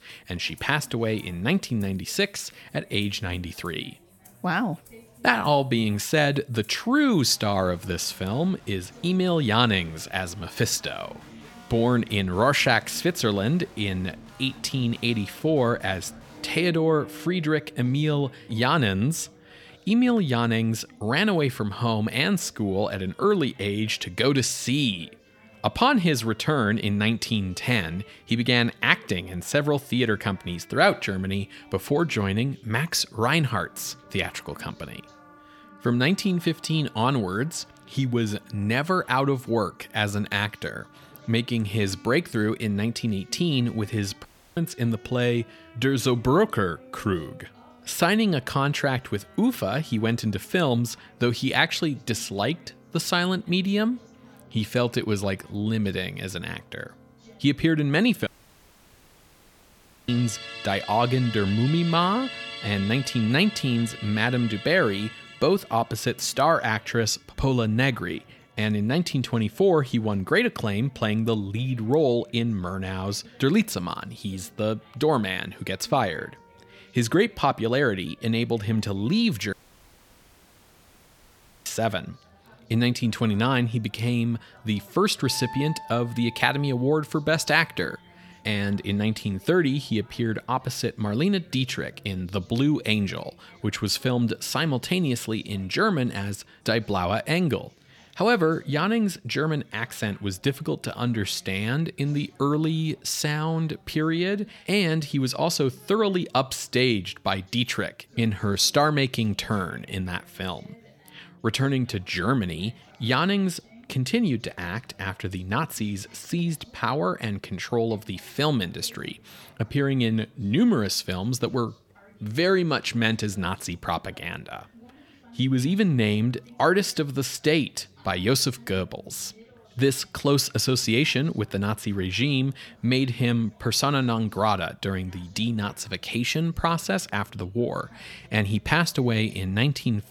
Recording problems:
background music; noticeable; until 1:33; 20 dB below the speech
background chatter; faint; throughout; 4 voices, 30 dB below the speech
audio cutting out; at 44 s, at 58 s for 2 s and at 1:20 for 2 s

